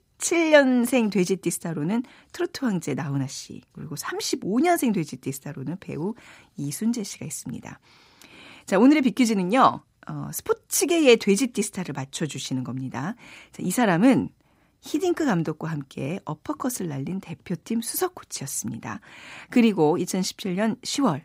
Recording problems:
none

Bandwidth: 15.5 kHz